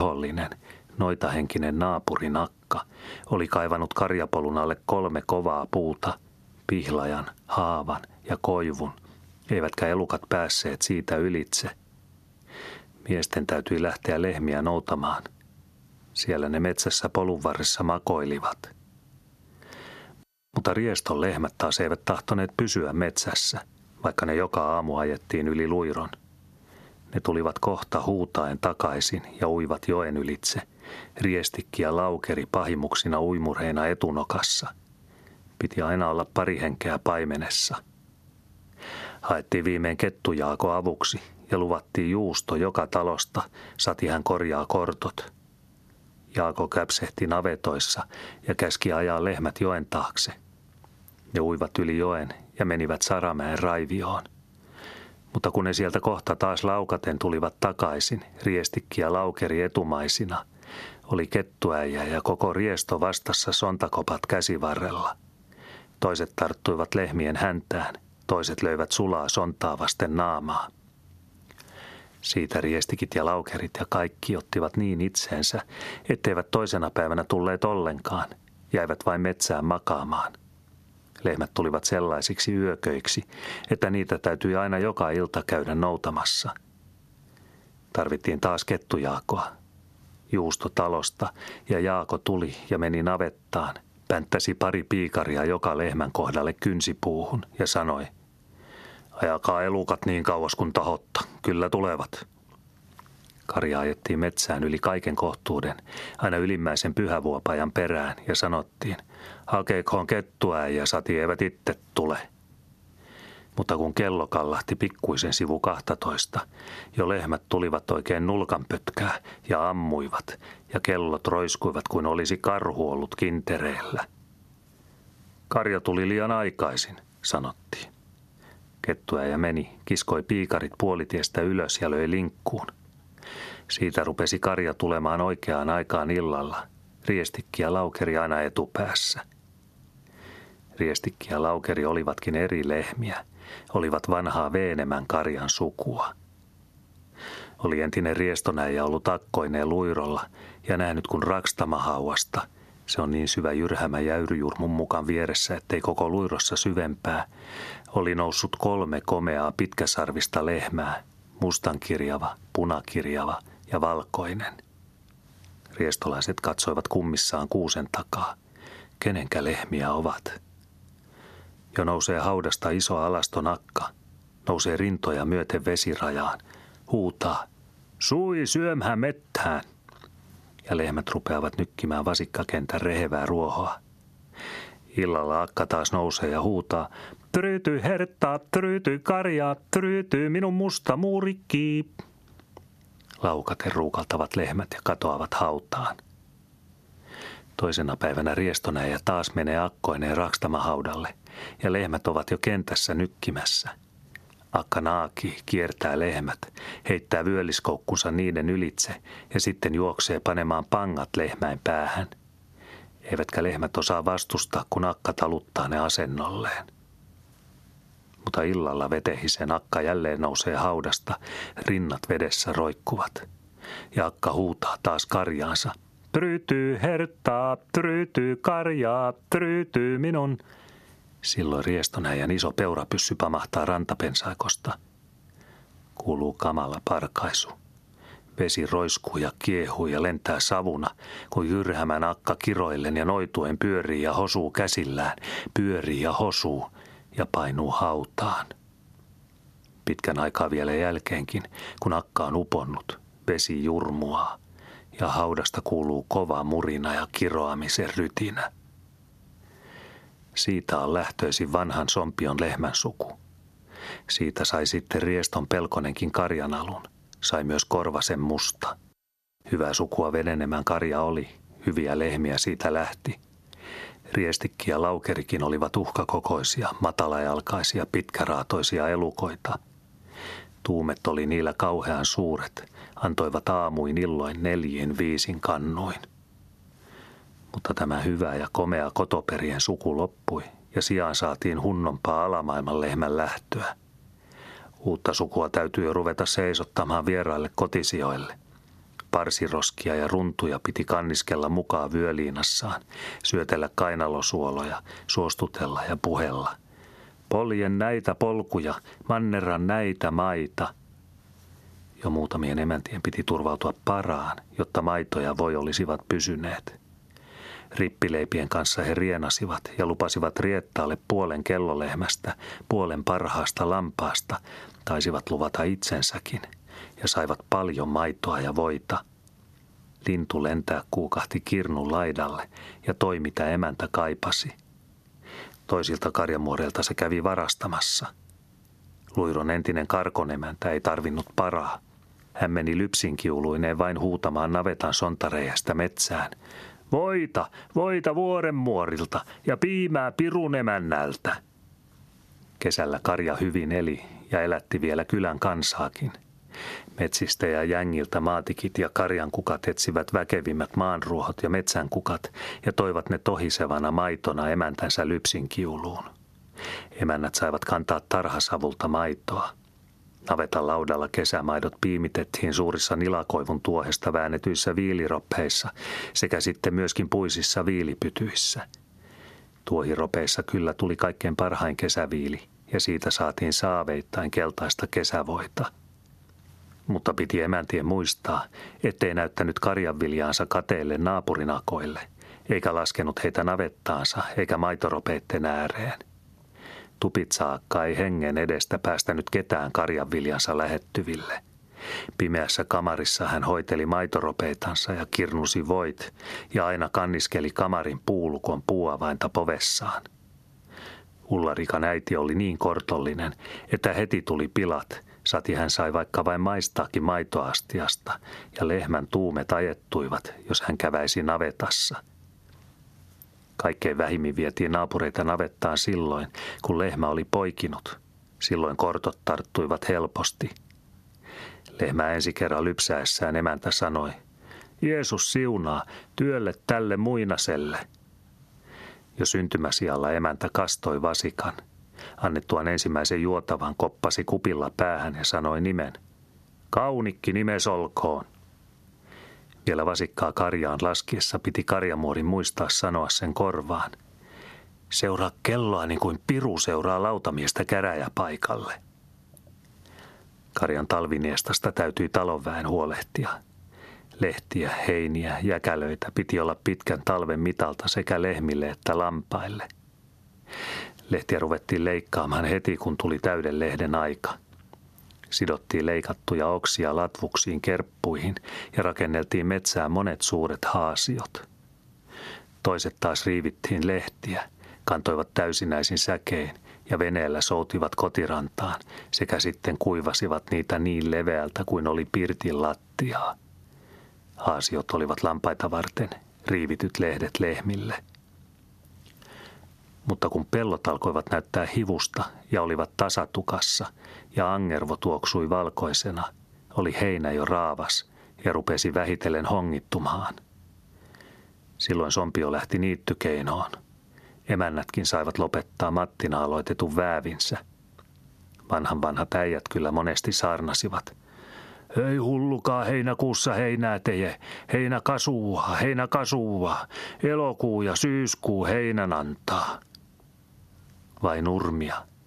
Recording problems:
squashed, flat; heavily
abrupt cut into speech; at the start

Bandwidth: 13.5 kHz